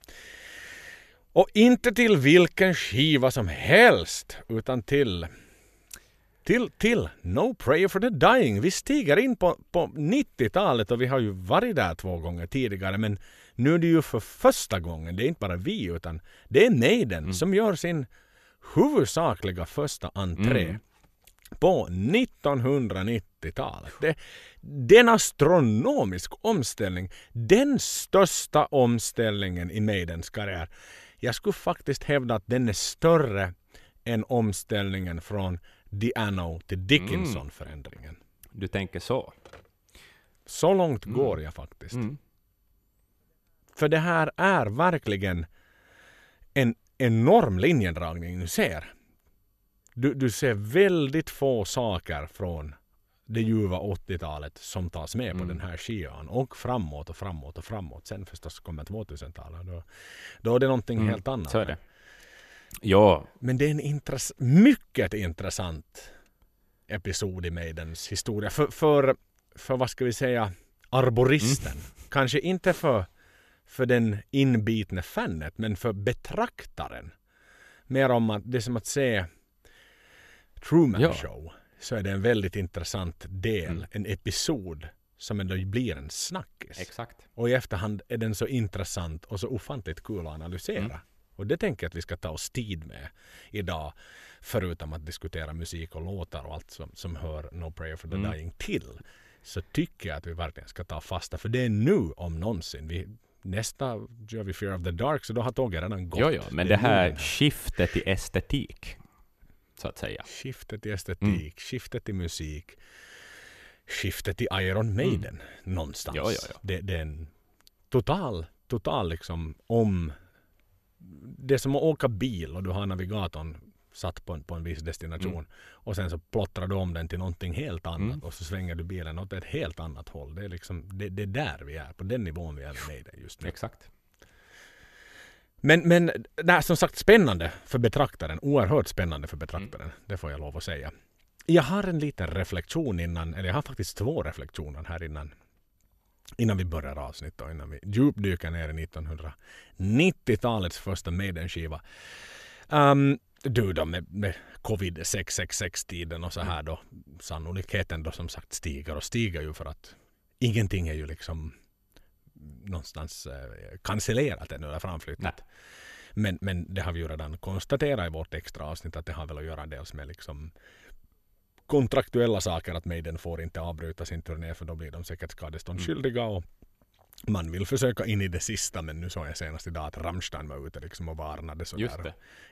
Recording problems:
none

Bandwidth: 14 kHz